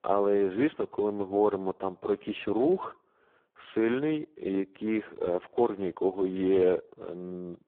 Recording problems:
phone-call audio; poor line

